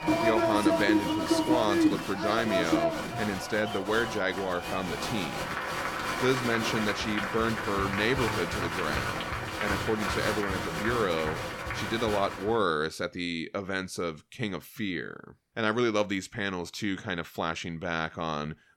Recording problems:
crowd noise; very loud; until 12 s; as loud as the speech

